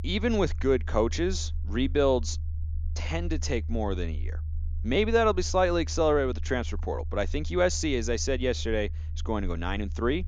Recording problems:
low rumble; faint; throughout; 25 dB below the speech

